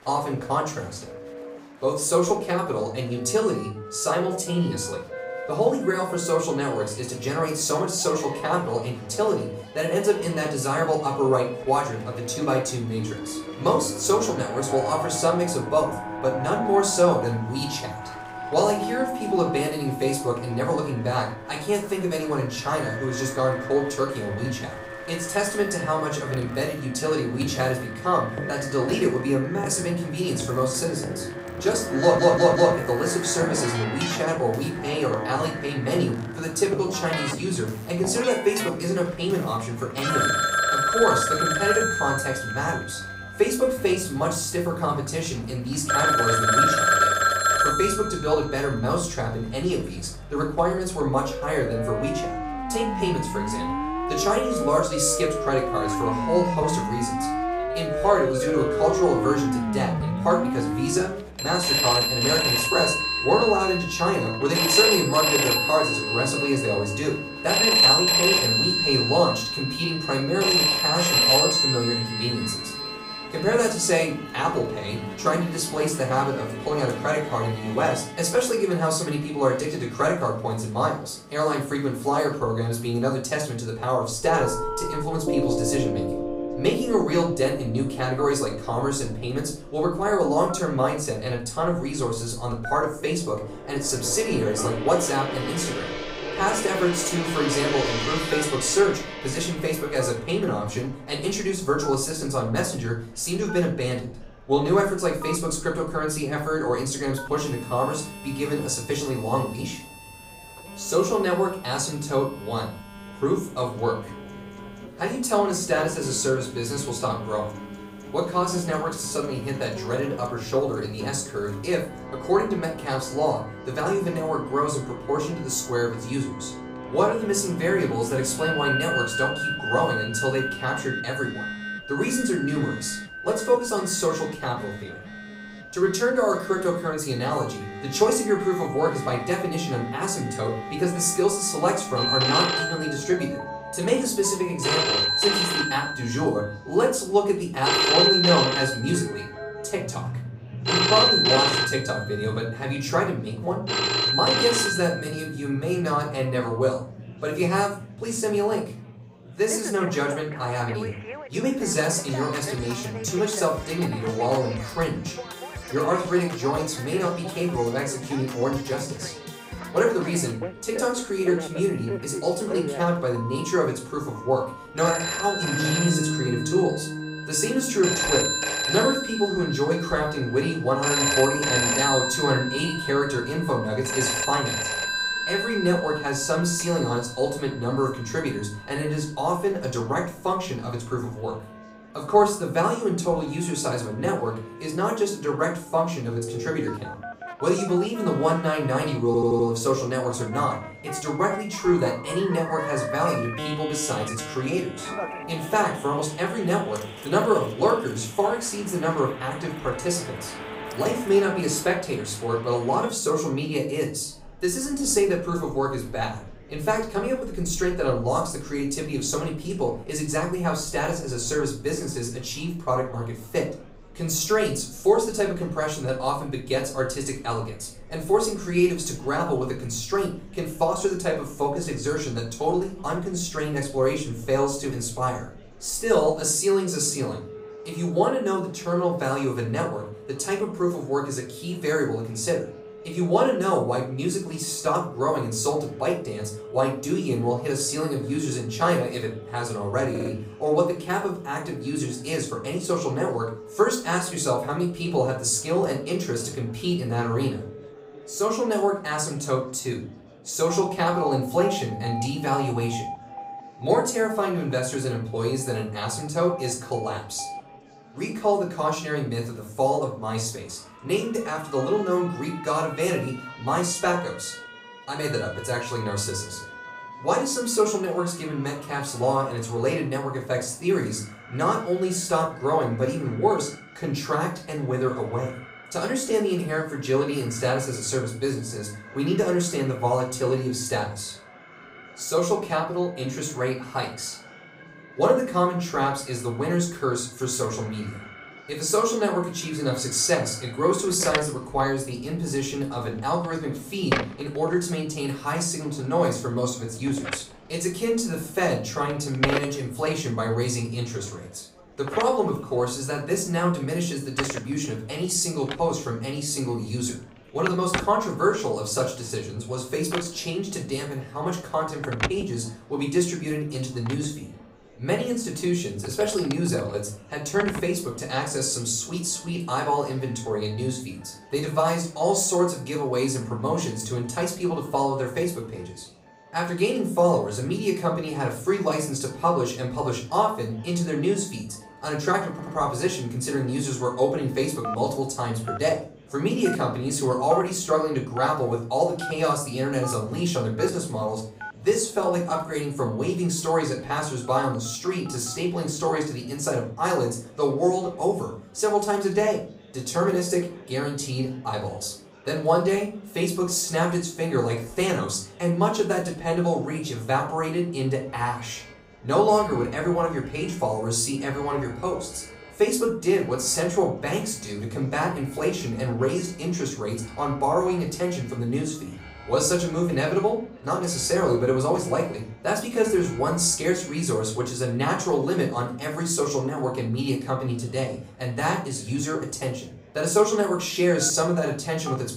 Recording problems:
off-mic speech; far
room echo; slight; dies away in 0.4 s
alarms or sirens; loud; throughout; 2 dB below the speech
background music; noticeable; until 3:32; 10 dB below the speech
murmuring crowd; faint; throughout; 25 dB below the speech
audio stuttering; 4 times, first at 32 s

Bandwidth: 15.5 kHz